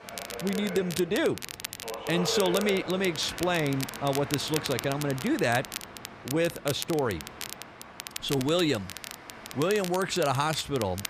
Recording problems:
train or aircraft noise; noticeable; throughout; 10 dB below the speech
crackle, like an old record; noticeable; 10 dB below the speech

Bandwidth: 14.5 kHz